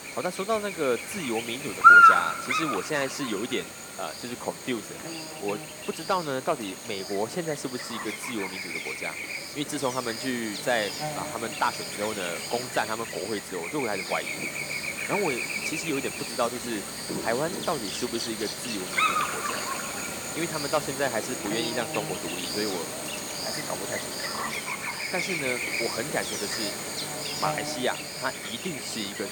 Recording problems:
animal sounds; very loud; throughout; 4 dB above the speech

